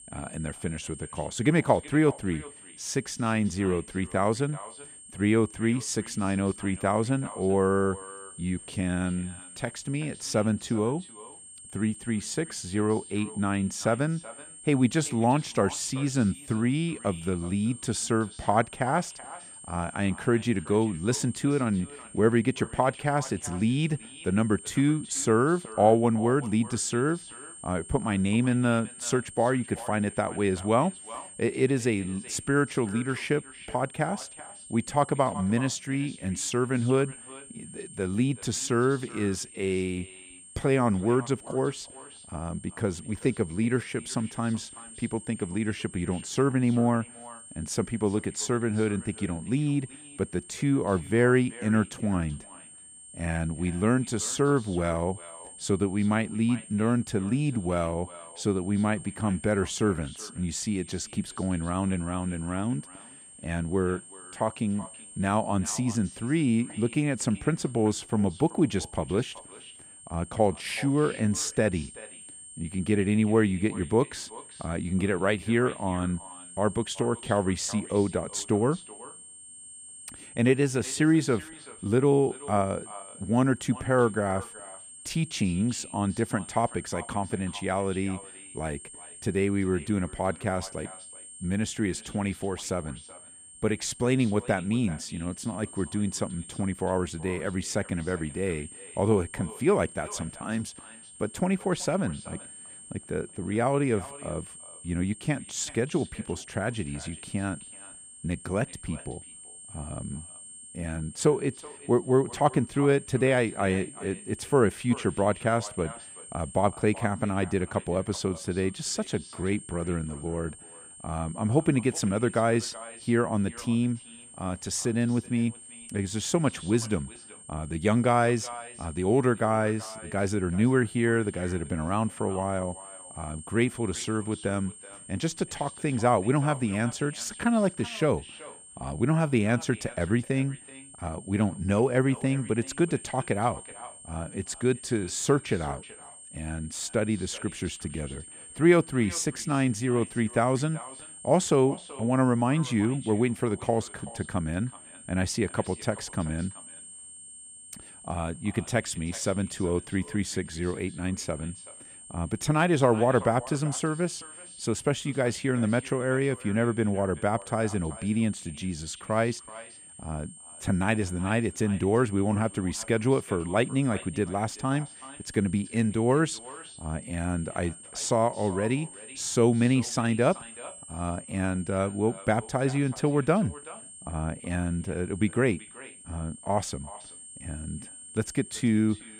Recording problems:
echo of what is said; faint; throughout; 380 ms later, 20 dB below the speech
high-pitched whine; noticeable; throughout; 8.5 kHz, 15 dB below the speech

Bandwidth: 15 kHz